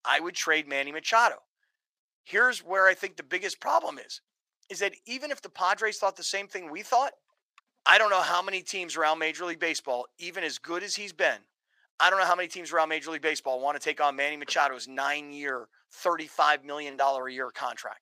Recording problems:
thin; very; fading below 900 Hz

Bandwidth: 15 kHz